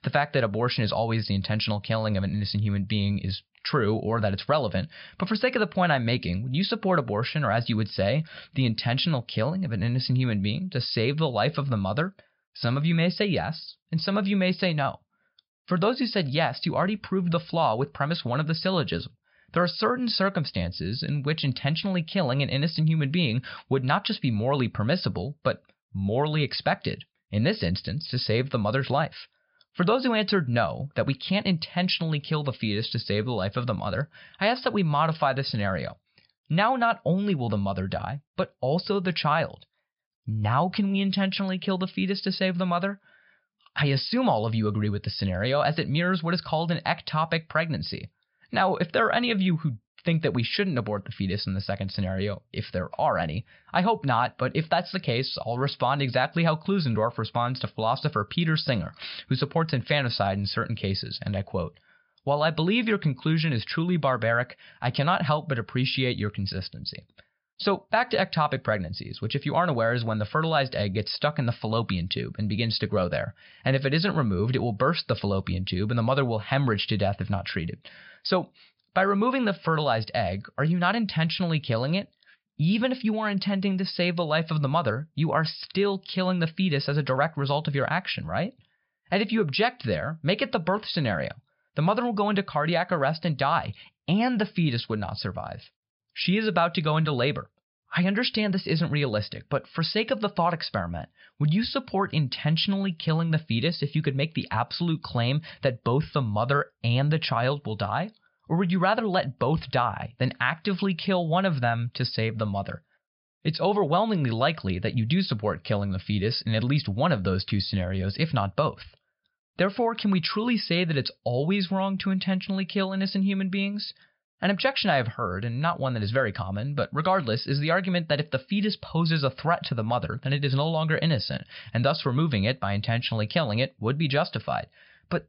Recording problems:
high frequencies cut off; noticeable; nothing above 5.5 kHz

